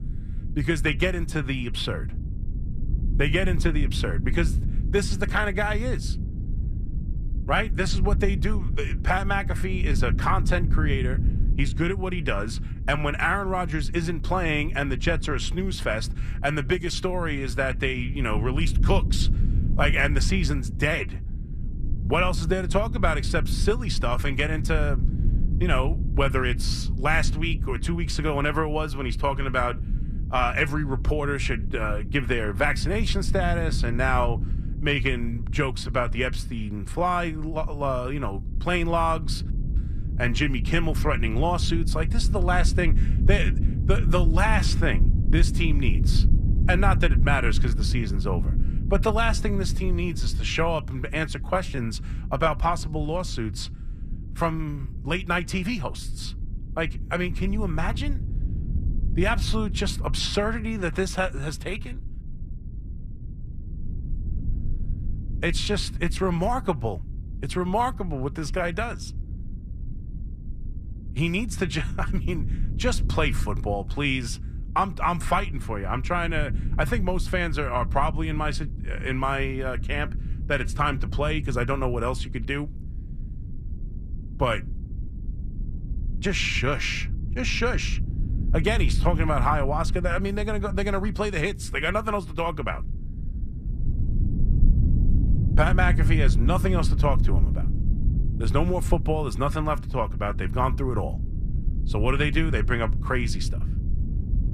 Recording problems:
low rumble; noticeable; throughout; 15 dB below the speech

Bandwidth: 14.5 kHz